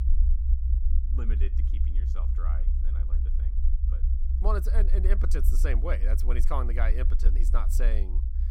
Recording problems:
low rumble; noticeable; throughout; 10 dB below the speech

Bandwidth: 16.5 kHz